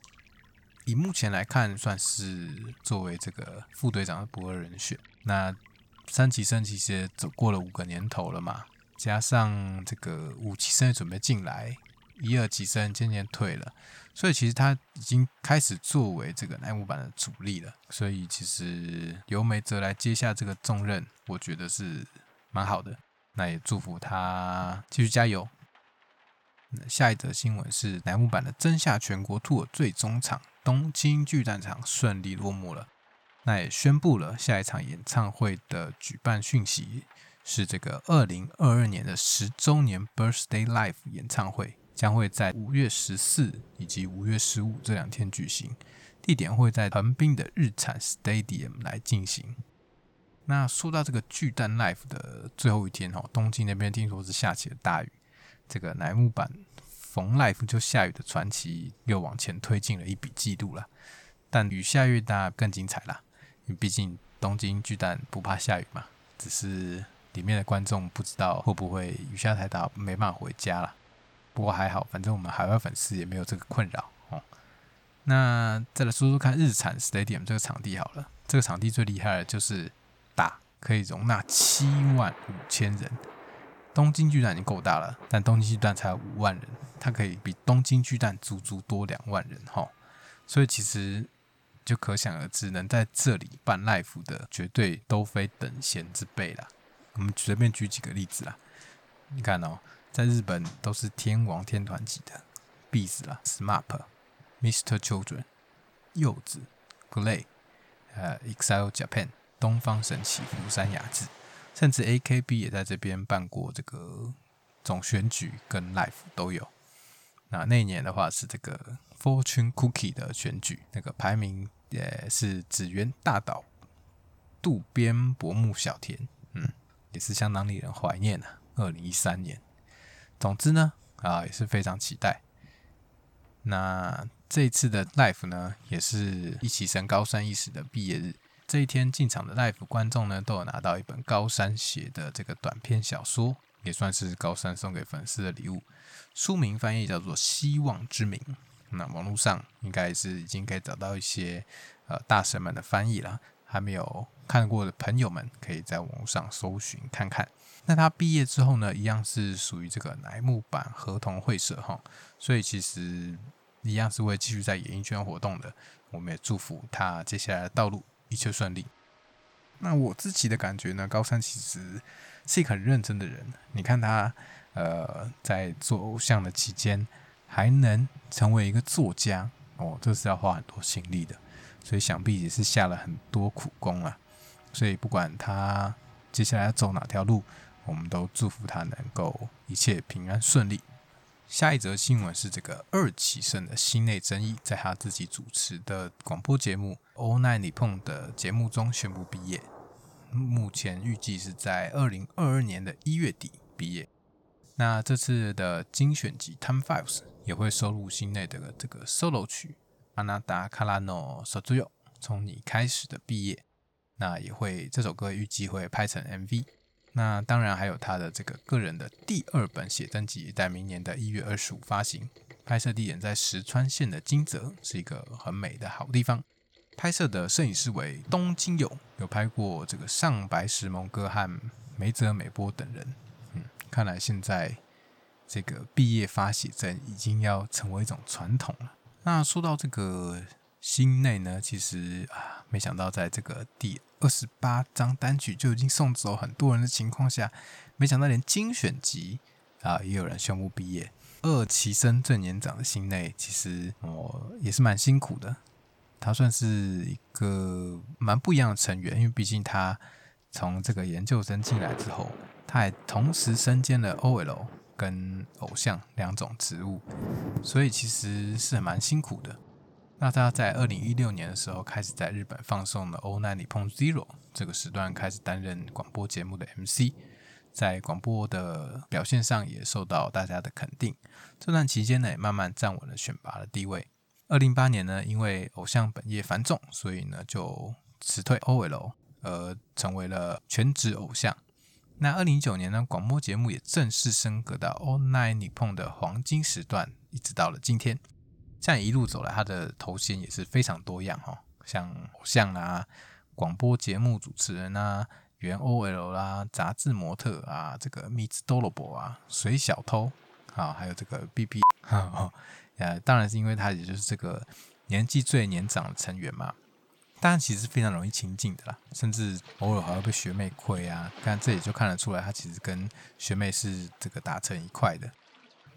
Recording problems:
rain or running water; faint; throughout; 25 dB below the speech

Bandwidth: 18.5 kHz